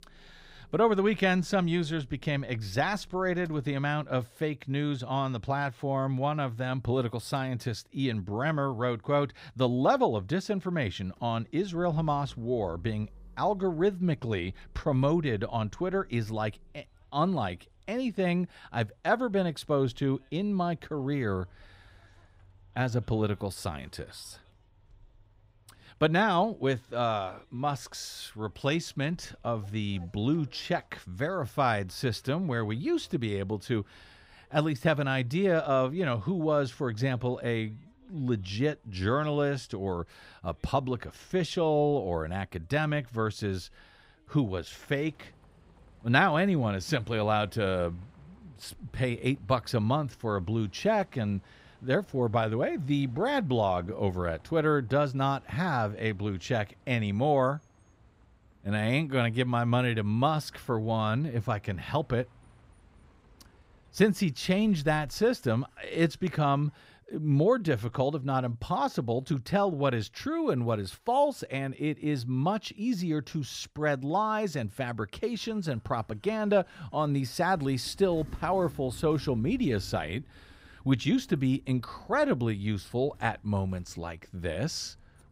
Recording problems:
traffic noise; faint; throughout; 30 dB below the speech

